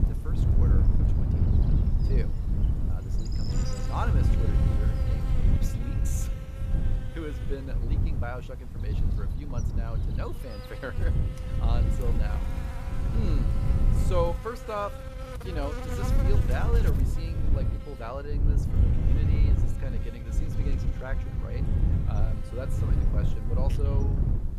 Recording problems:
wind noise on the microphone; heavy; 3 dB below the speech
electrical hum; loud; throughout; 50 Hz, 7 dB below the speech

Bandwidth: 14.5 kHz